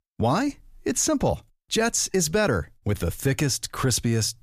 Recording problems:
none

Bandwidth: 14.5 kHz